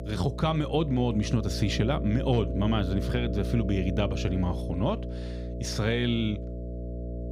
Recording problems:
electrical hum; loud; throughout; 60 Hz, 9 dB below the speech

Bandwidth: 15.5 kHz